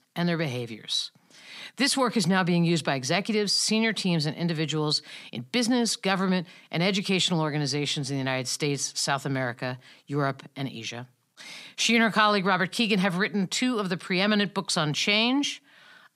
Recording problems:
none

